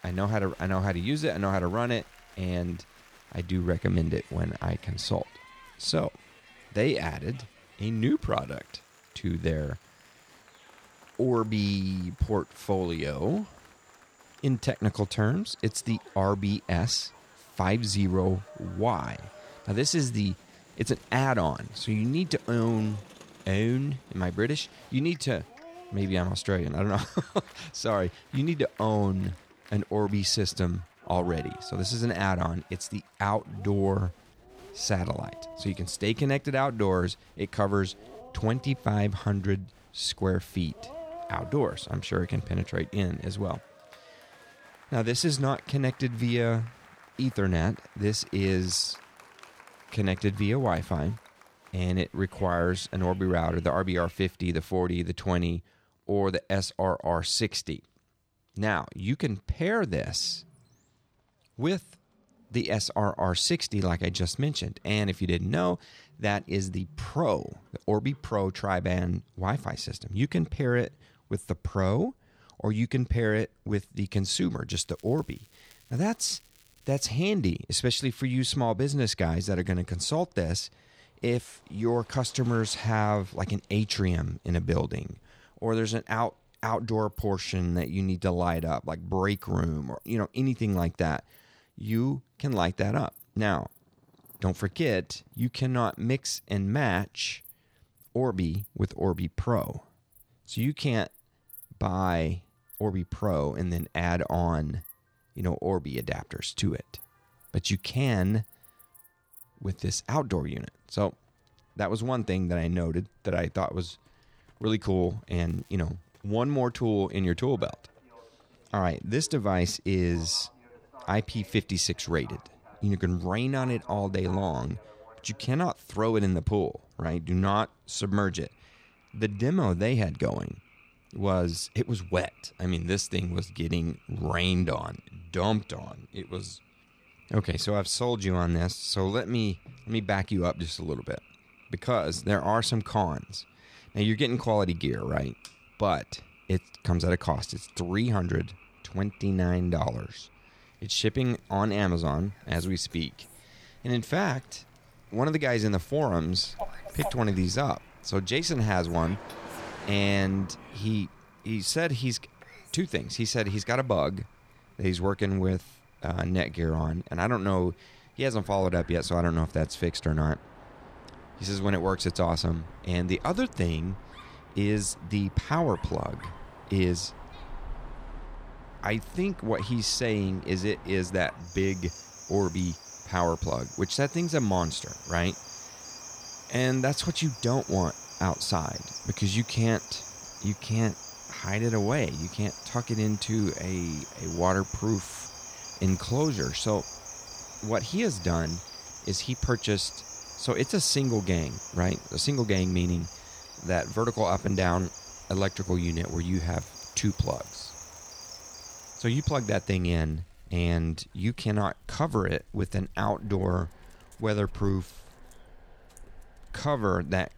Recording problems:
animal sounds; noticeable; throughout; 15 dB below the speech
crowd noise; faint; until 54 s; 25 dB below the speech
traffic noise; faint; throughout; 30 dB below the speech
crackling; faint; 4 times, first at 1:15; 30 dB below the speech

